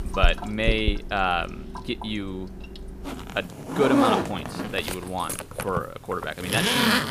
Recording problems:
household noises; very loud; throughout; 1 dB above the speech

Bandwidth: 15 kHz